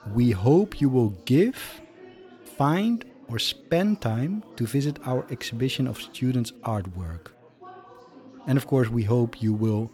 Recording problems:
chatter from many people; faint; throughout; 25 dB below the speech

